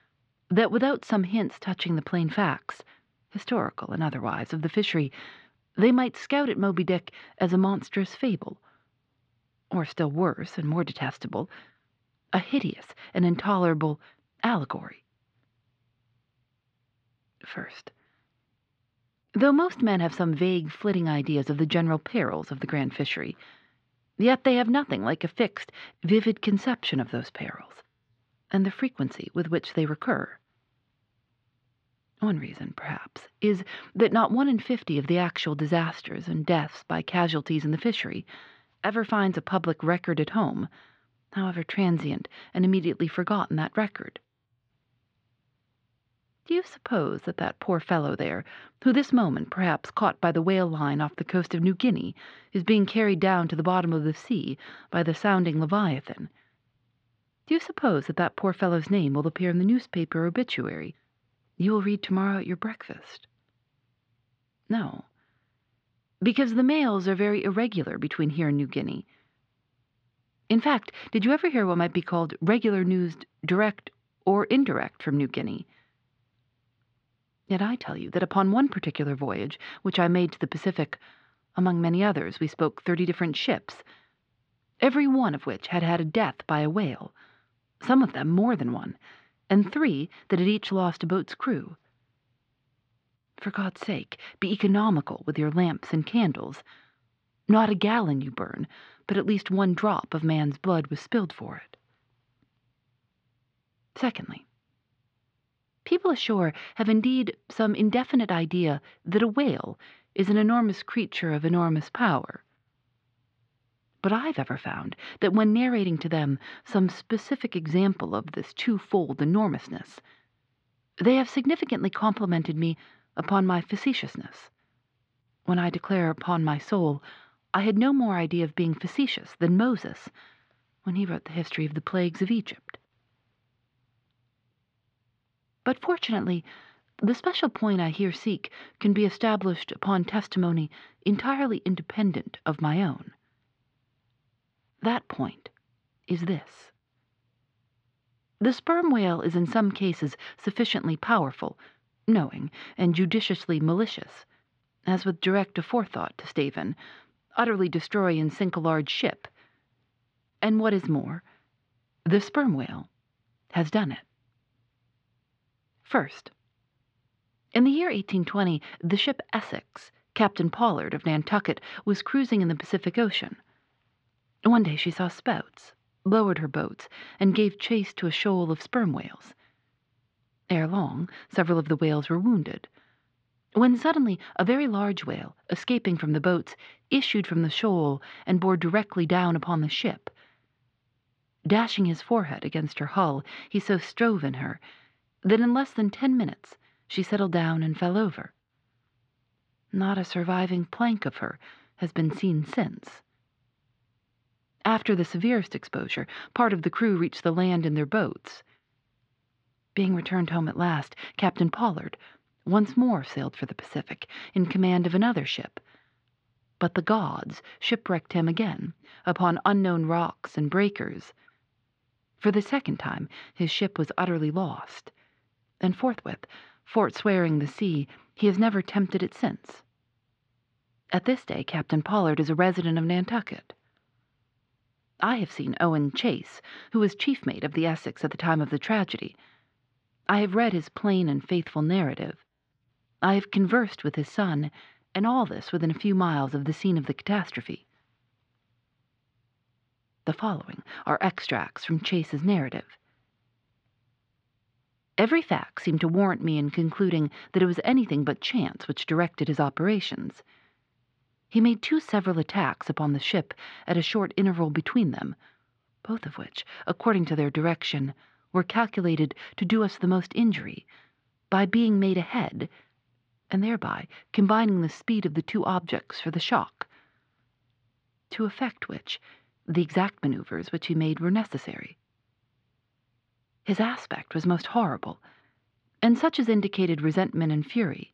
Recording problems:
muffled; slightly; fading above 3.5 kHz

